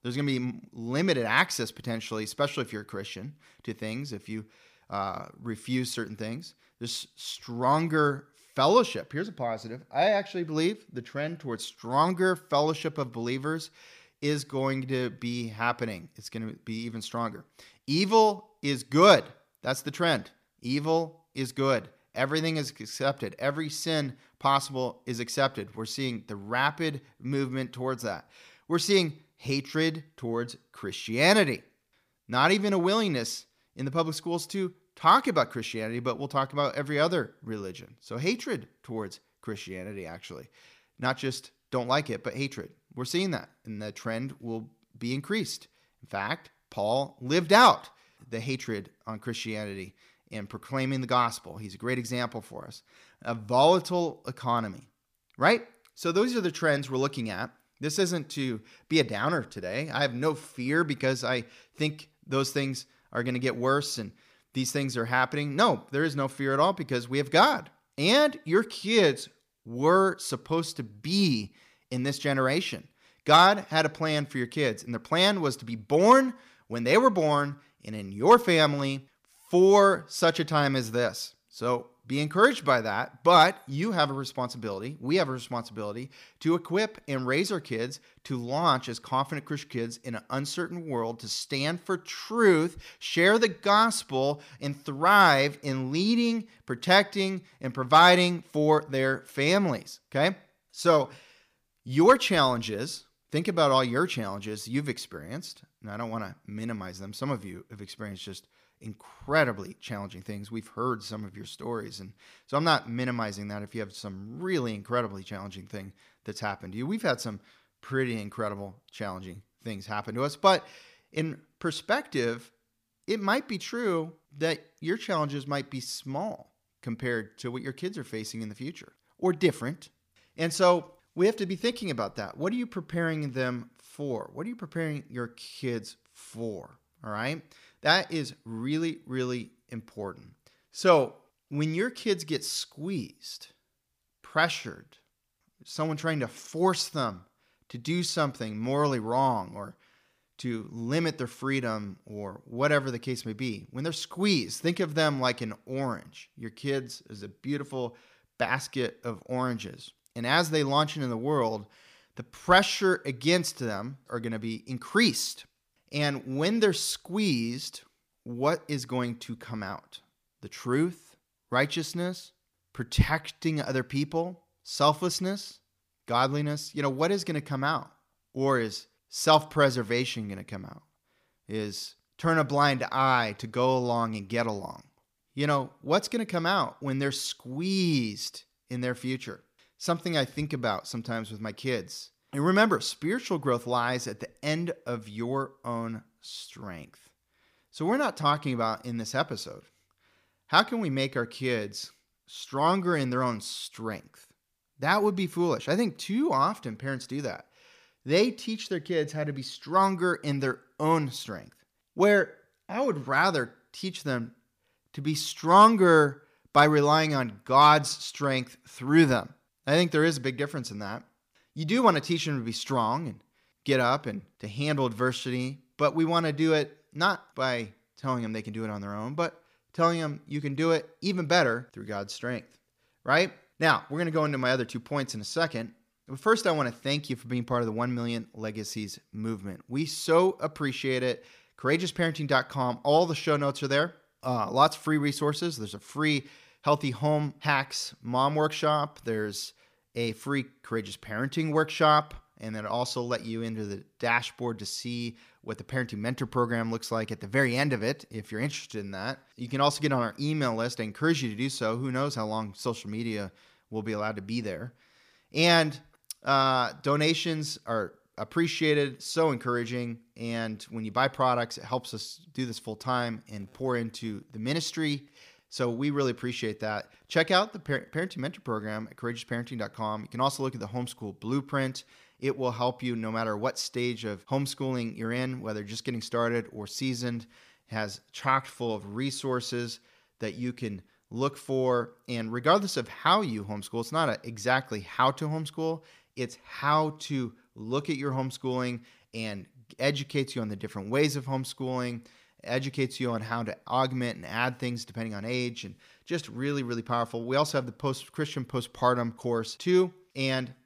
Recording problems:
none

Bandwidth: 15 kHz